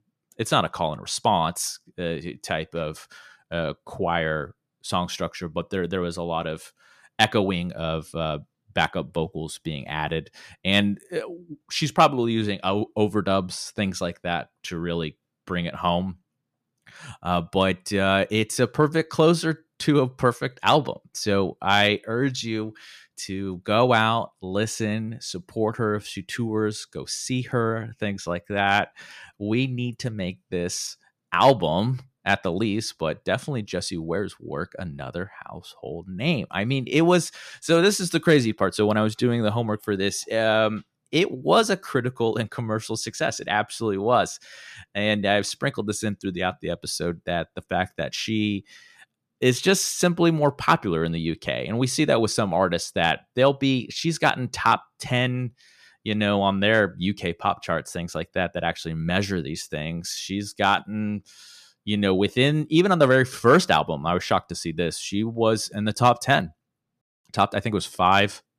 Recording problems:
none

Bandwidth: 14.5 kHz